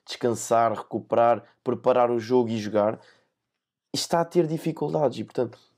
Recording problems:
none

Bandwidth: 15.5 kHz